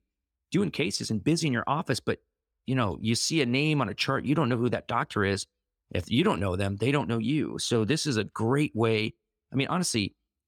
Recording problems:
none

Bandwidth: 18.5 kHz